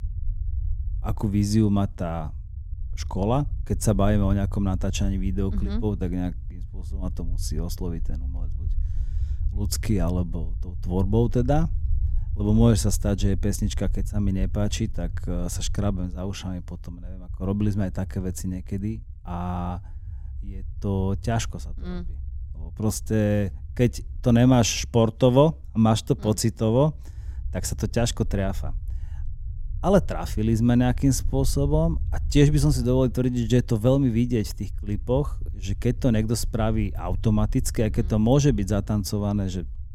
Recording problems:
low rumble; faint; throughout; 25 dB below the speech

